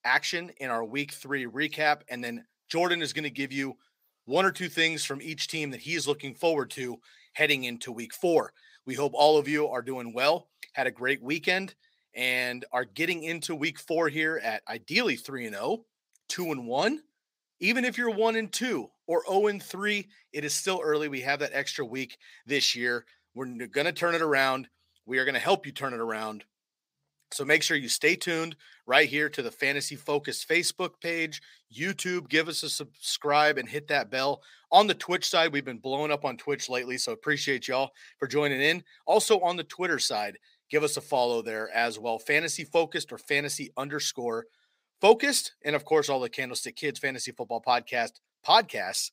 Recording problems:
thin; very slightly; fading below 550 Hz

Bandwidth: 15.5 kHz